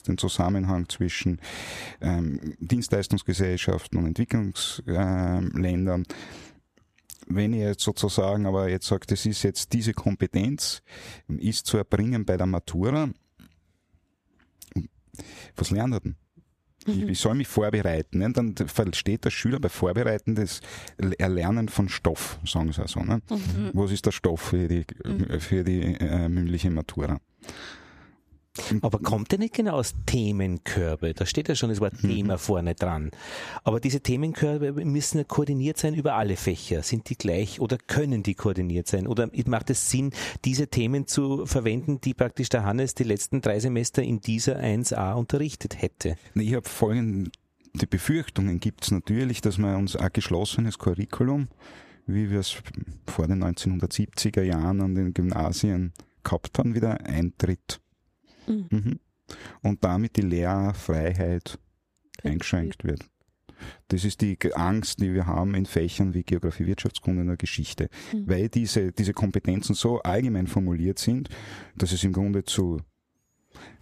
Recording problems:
squashed, flat; somewhat

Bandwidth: 14.5 kHz